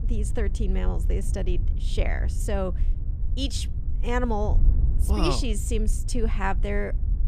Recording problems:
wind noise on the microphone; occasional gusts; 15 dB below the speech

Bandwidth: 14.5 kHz